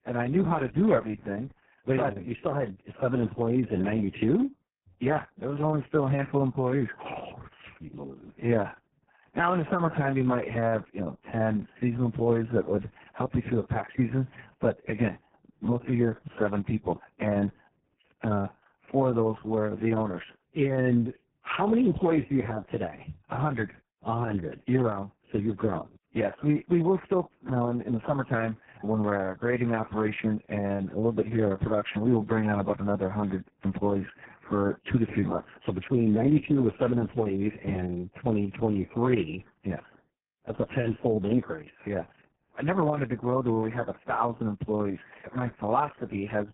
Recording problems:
garbled, watery; badly

